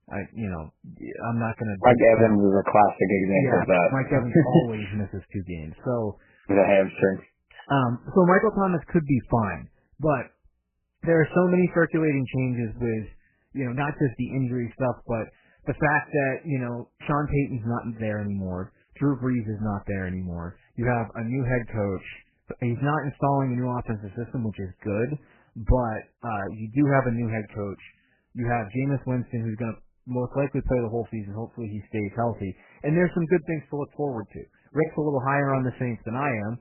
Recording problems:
garbled, watery; badly; nothing above 2.5 kHz

